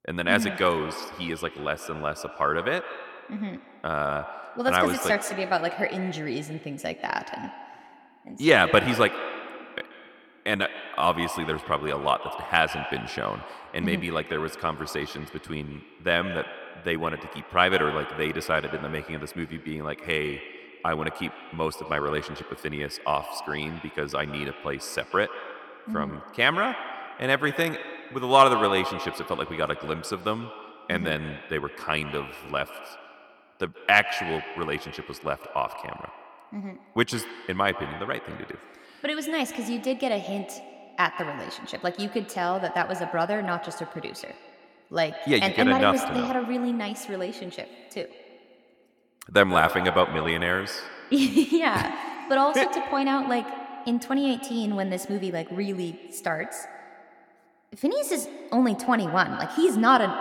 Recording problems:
echo of what is said; strong; throughout; 130 ms later, 10 dB below the speech

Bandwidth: 17 kHz